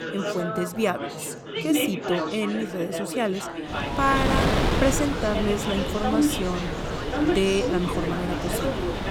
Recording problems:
wind noise on the microphone; heavy; from 3.5 s on; 2 dB below the speech
chatter from many people; loud; throughout; 2 dB below the speech

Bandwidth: 18.5 kHz